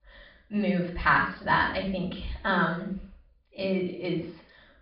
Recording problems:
off-mic speech; far
high frequencies cut off; severe; nothing above 5 kHz
room echo; noticeable; dies away in 0.5 s

